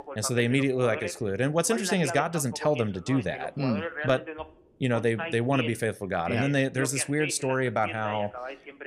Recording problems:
voice in the background; loud; throughout; 10 dB below the speech

